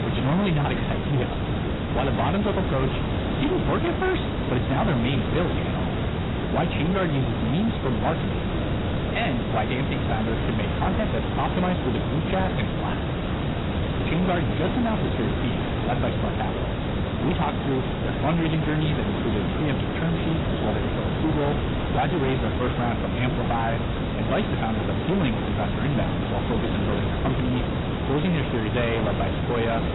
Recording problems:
garbled, watery; badly; nothing above 4 kHz
distortion; slight; 19% of the sound clipped
hiss; loud; throughout; as loud as the speech

